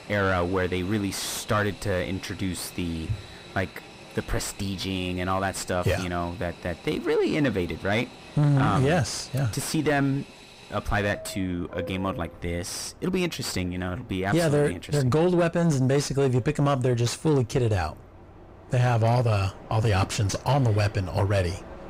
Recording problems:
distortion; slight; 9 dB below the speech
train or aircraft noise; noticeable; throughout; 20 dB below the speech

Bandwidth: 15.5 kHz